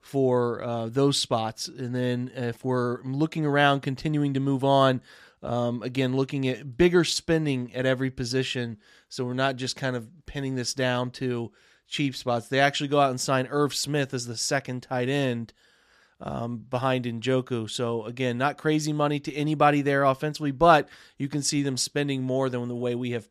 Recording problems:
none

